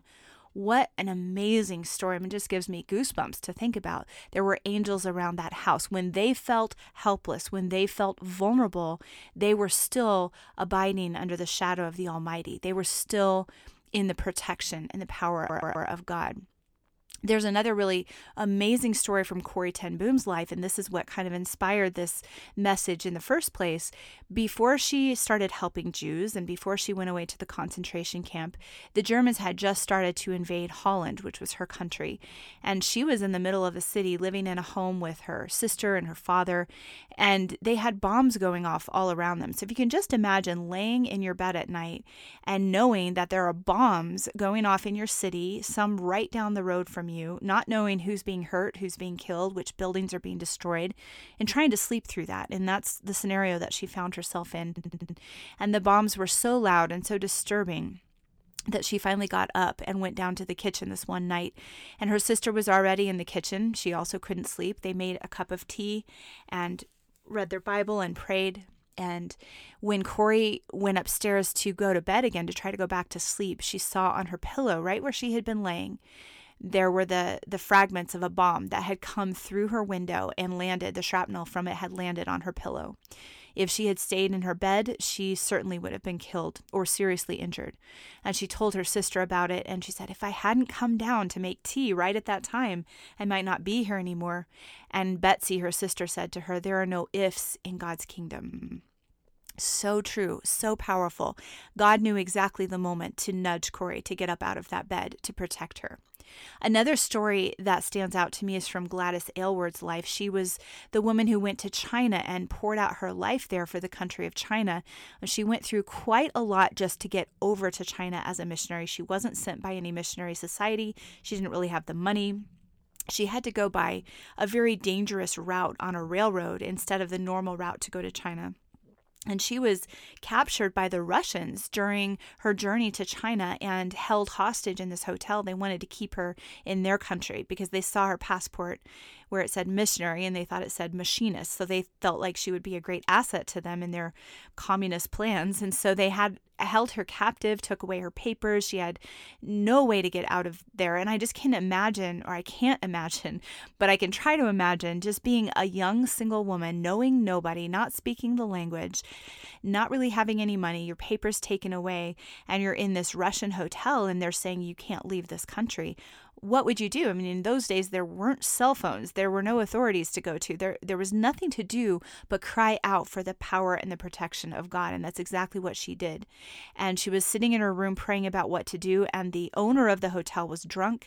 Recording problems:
audio stuttering; 4 times, first at 15 s

